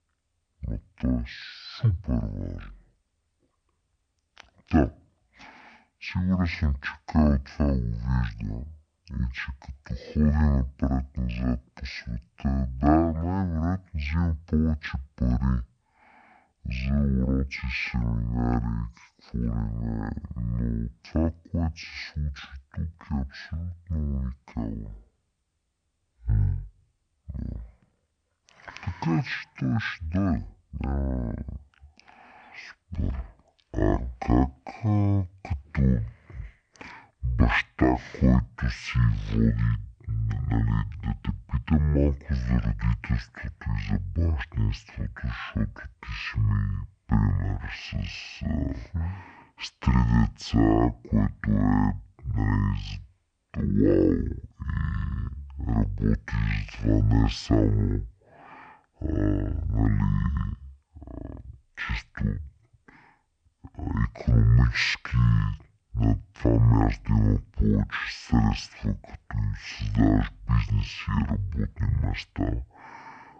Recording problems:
wrong speed and pitch; too slow and too low; 0.5 times normal speed

